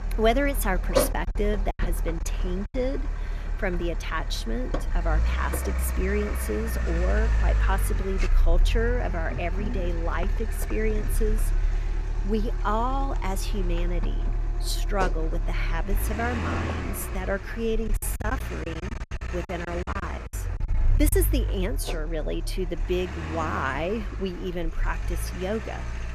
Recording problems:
traffic noise; very loud; throughout; 1 dB above the speech
choppy; very; from 1 to 2.5 s and from 18 to 21 s; 15% of the speech affected

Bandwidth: 14.5 kHz